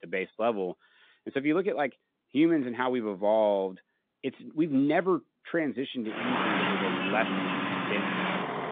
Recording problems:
phone-call audio; nothing above 3.5 kHz
traffic noise; loud; from 6.5 s on; as loud as the speech

